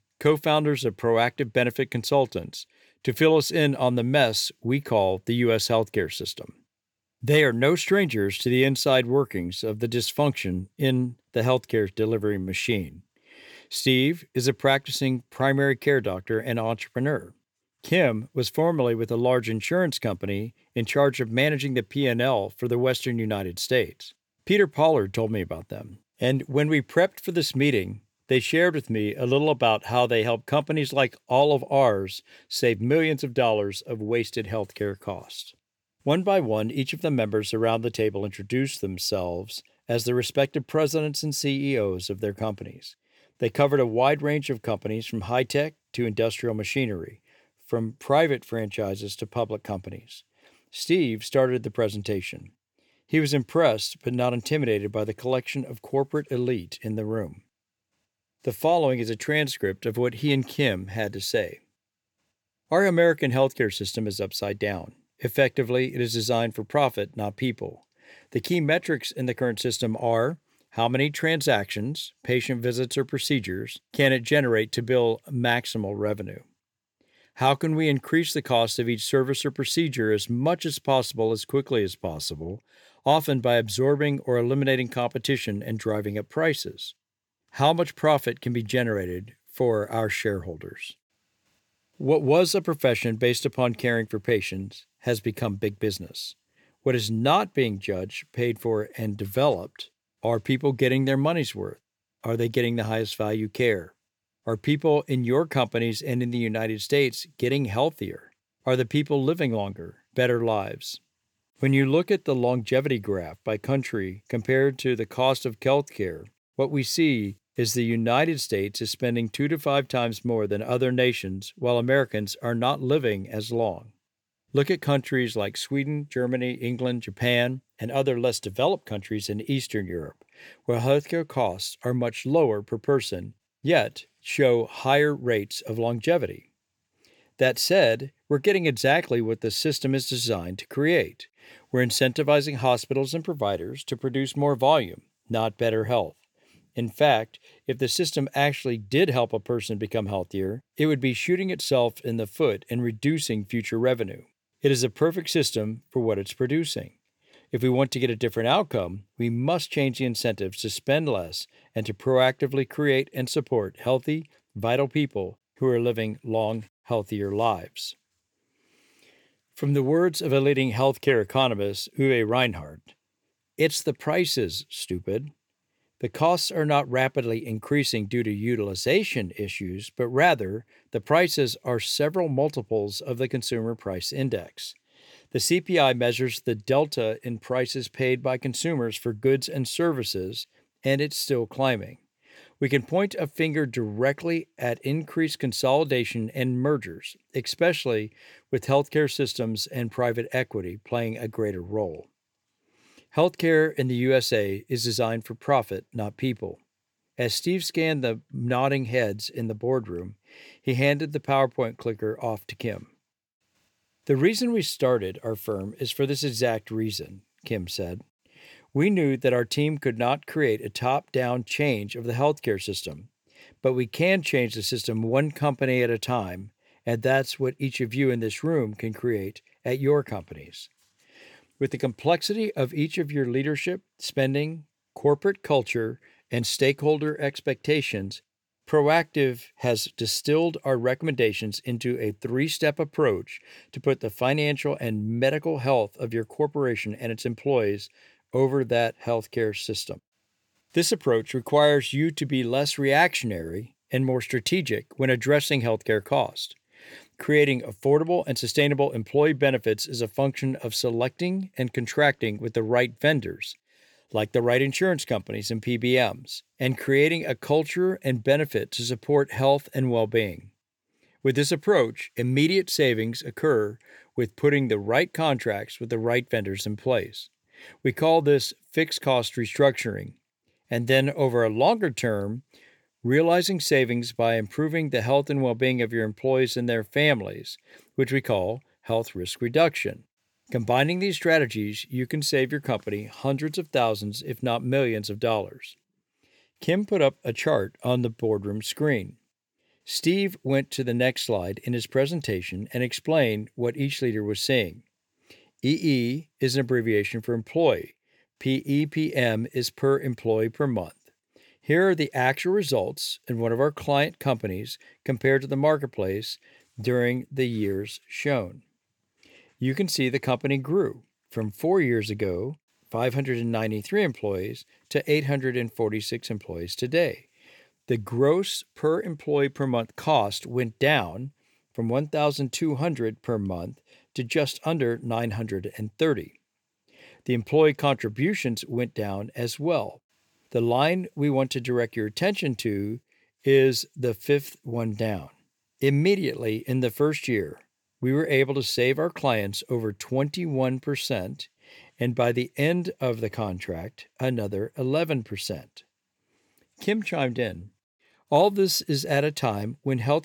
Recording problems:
none

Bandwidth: 19 kHz